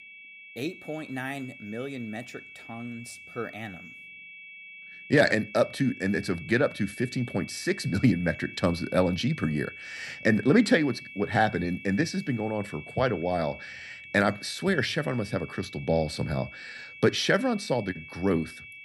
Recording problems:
high-pitched whine; noticeable; throughout; 2.5 kHz, 15 dB below the speech

